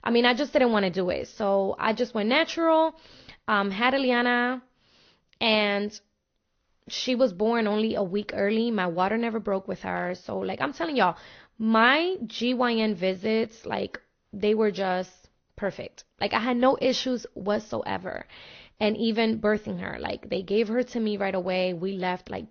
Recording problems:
garbled, watery; slightly; nothing above 6 kHz
high frequencies cut off; slight

